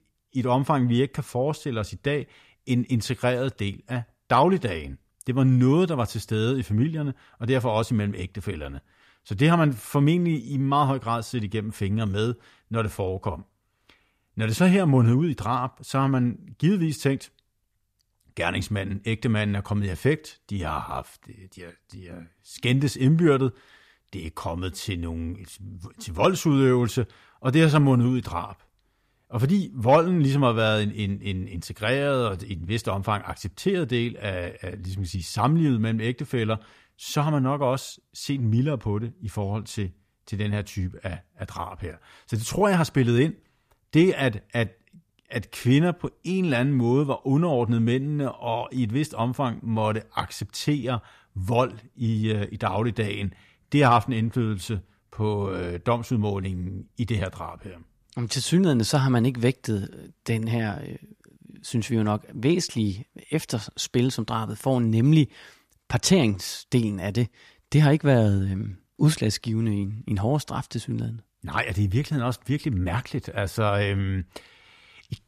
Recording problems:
none

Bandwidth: 14.5 kHz